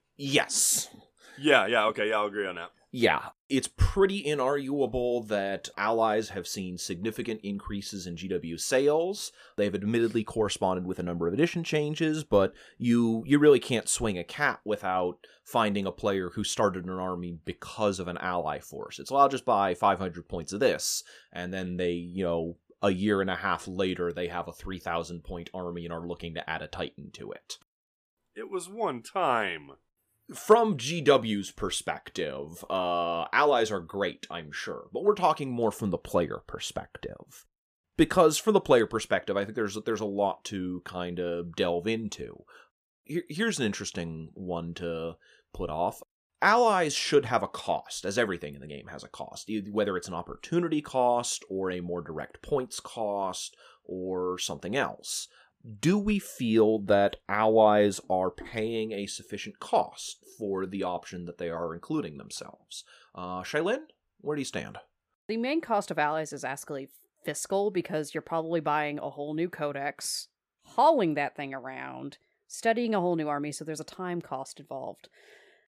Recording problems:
uneven, jittery; slightly; from 1.5 s to 1:15

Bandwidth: 14.5 kHz